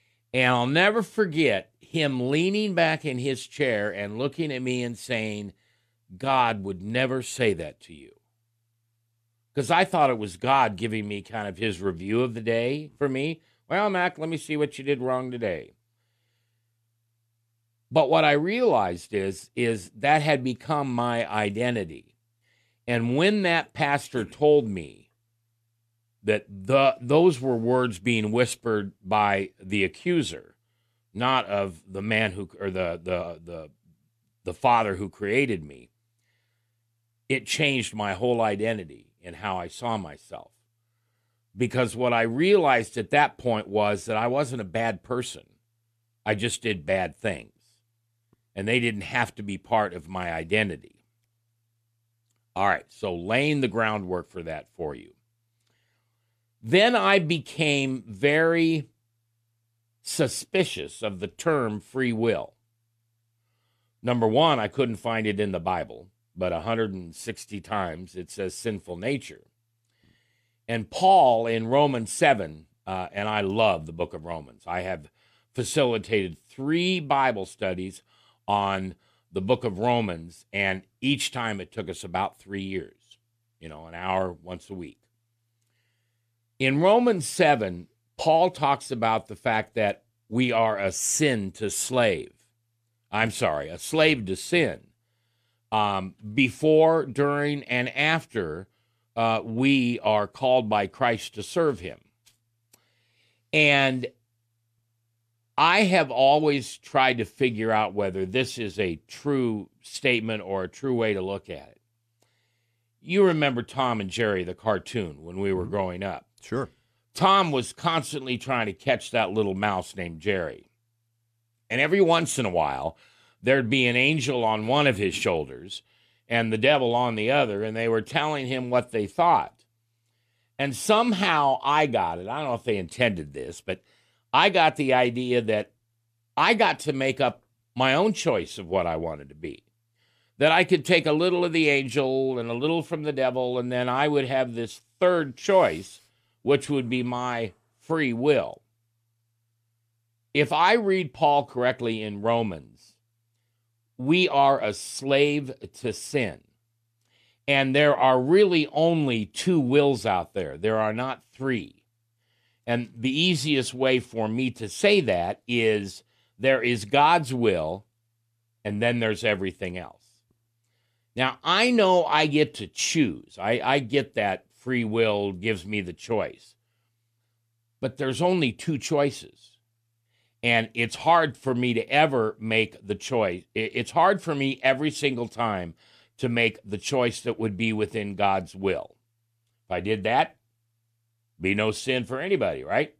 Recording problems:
none

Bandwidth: 14.5 kHz